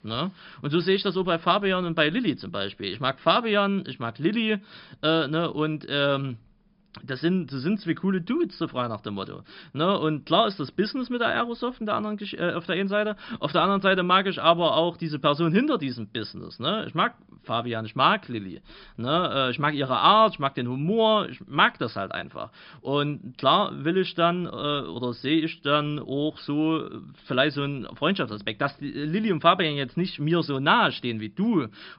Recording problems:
high frequencies cut off; noticeable; nothing above 5.5 kHz

